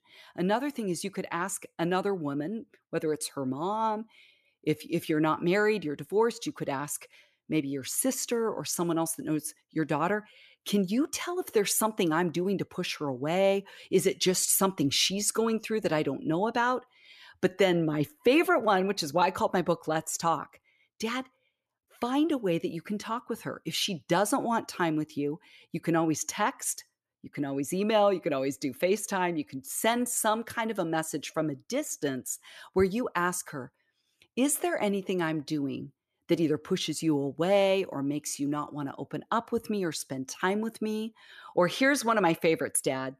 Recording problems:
none

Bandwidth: 14 kHz